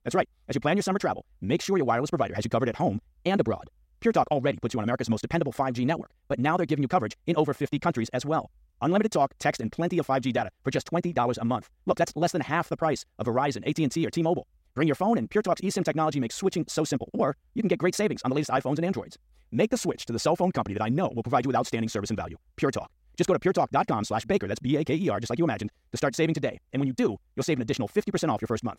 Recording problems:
wrong speed, natural pitch; too fast; 1.7 times normal speed

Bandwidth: 16 kHz